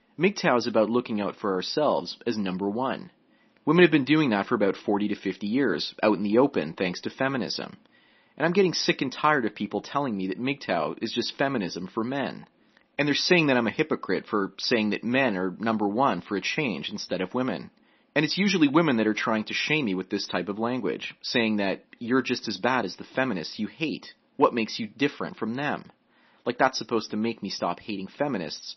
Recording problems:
garbled, watery; slightly; nothing above 6 kHz

